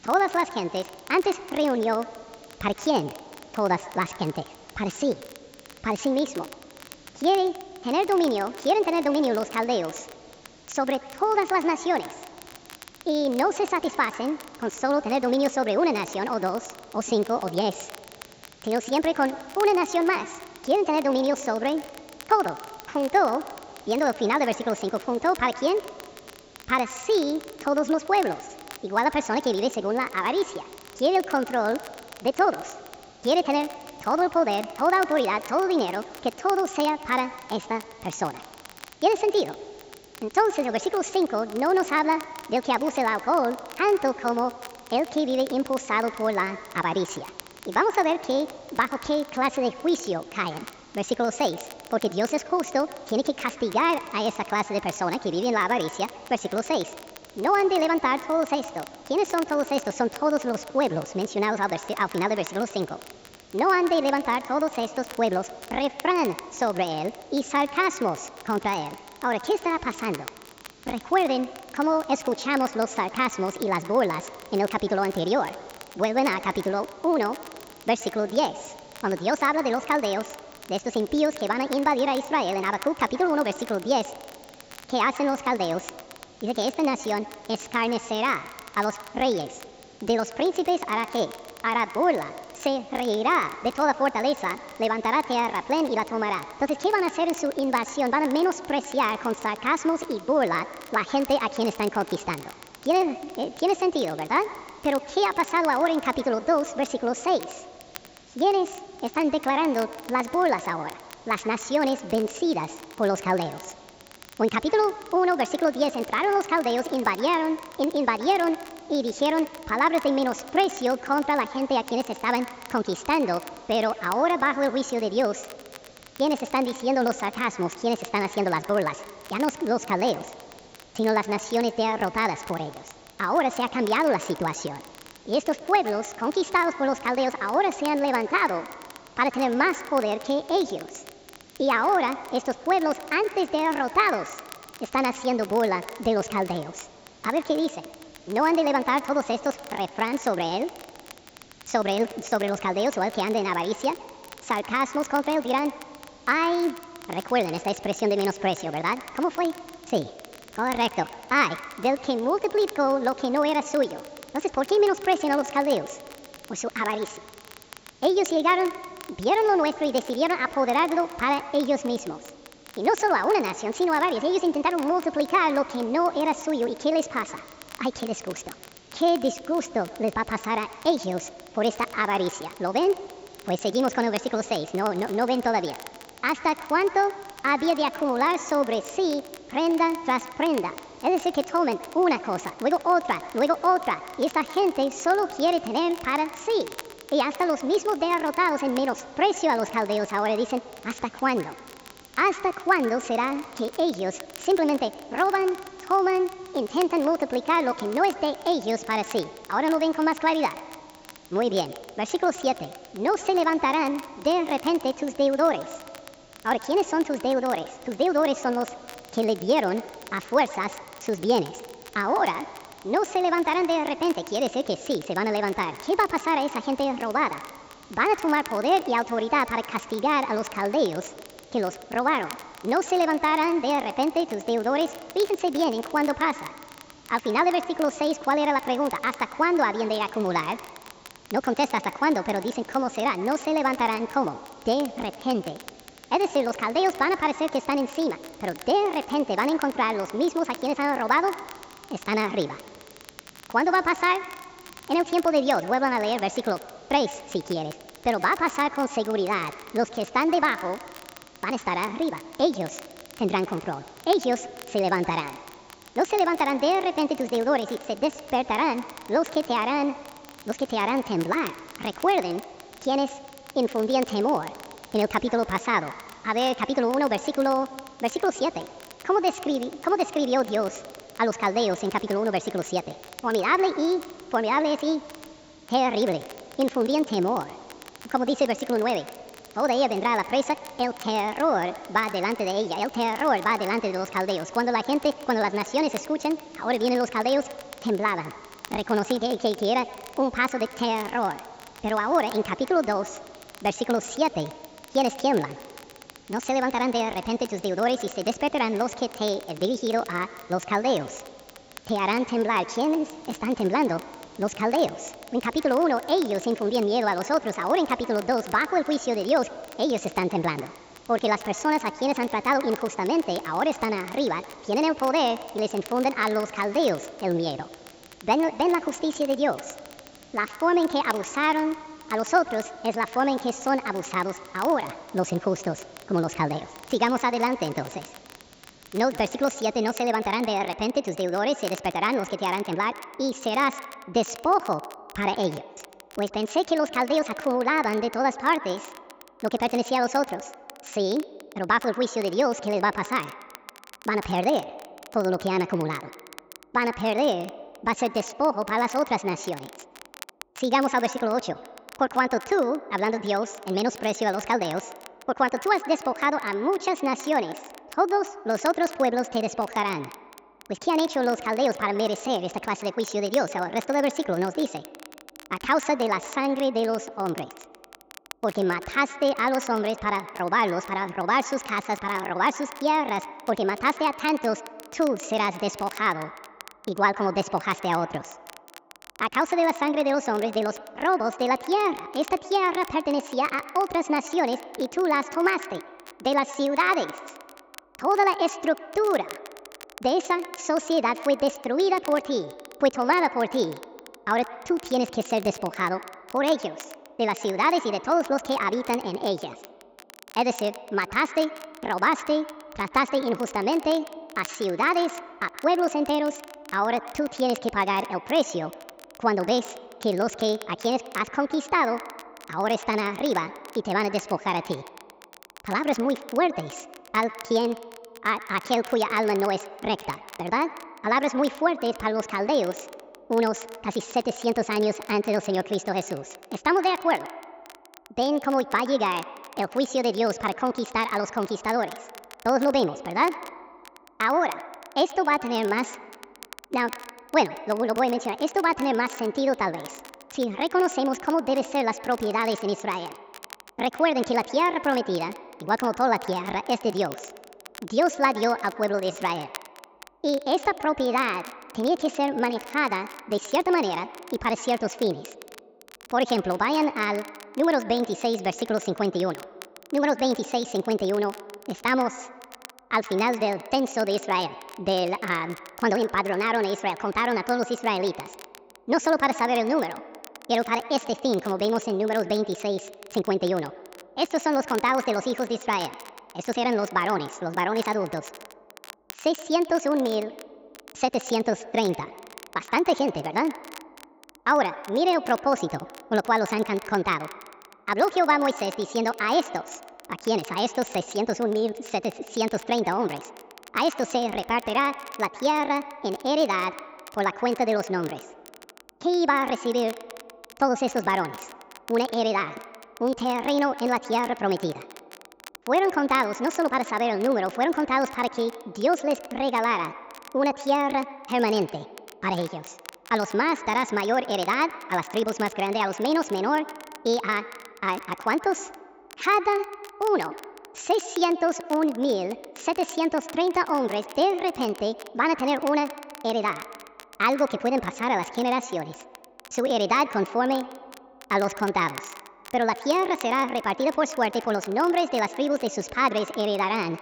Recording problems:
wrong speed and pitch; too fast and too high; 1.5 times normal speed
echo of what is said; noticeable; throughout; 120 ms later, 15 dB below the speech
high frequencies cut off; noticeable; nothing above 8 kHz
hiss; faint; until 5:40; 25 dB below the speech
crackle, like an old record; faint; 20 dB below the speech

